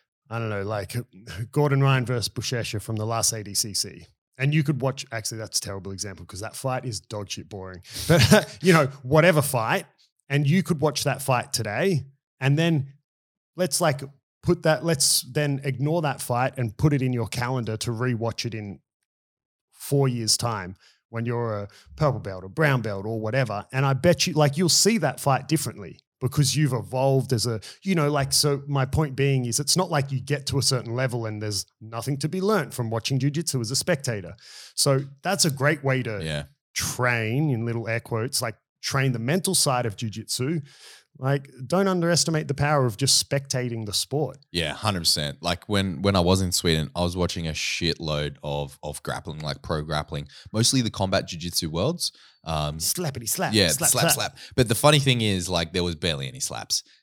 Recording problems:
none

